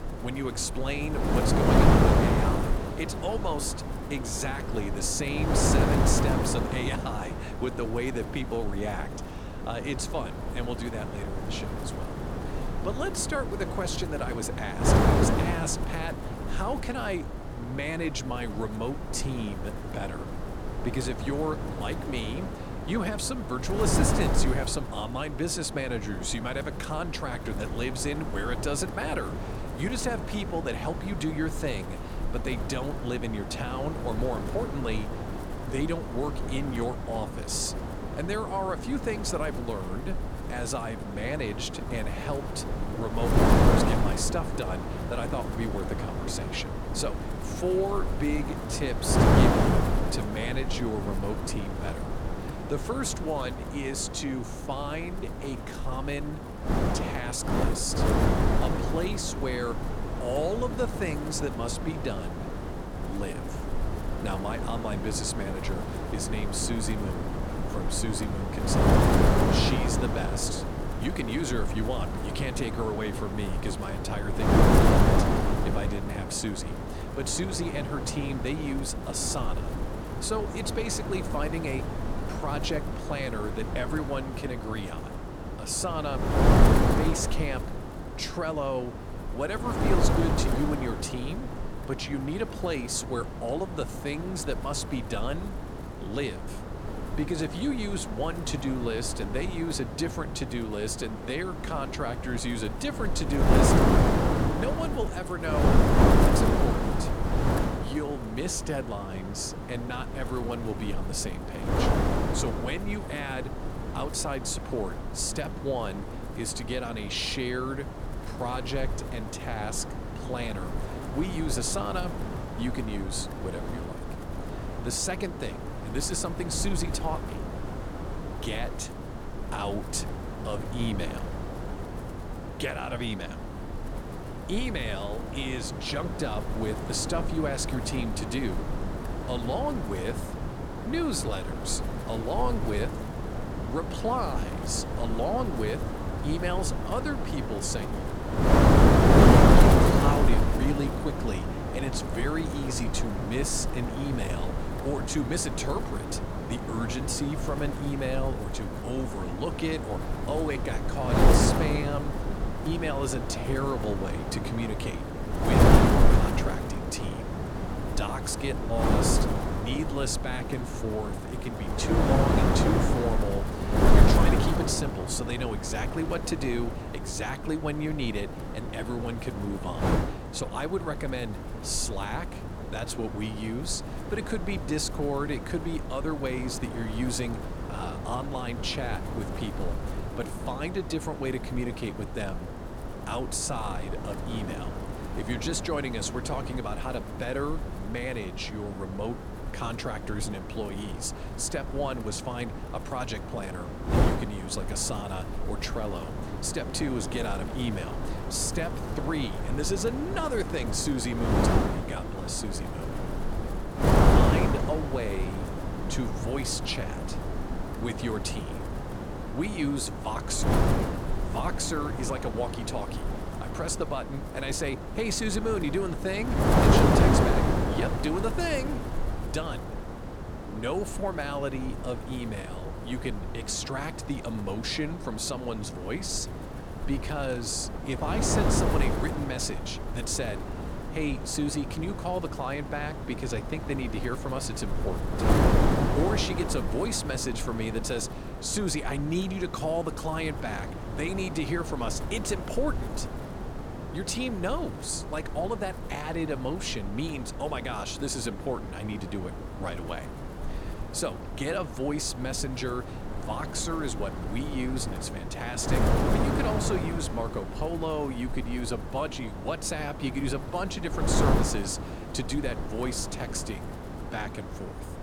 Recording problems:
wind noise on the microphone; heavy; as loud as the speech

